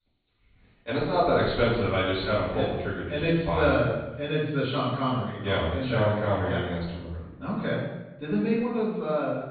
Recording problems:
off-mic speech; far
high frequencies cut off; severe; nothing above 4.5 kHz
room echo; noticeable; dies away in 0.8 s

